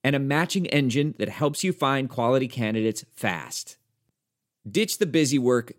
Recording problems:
none

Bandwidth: 16 kHz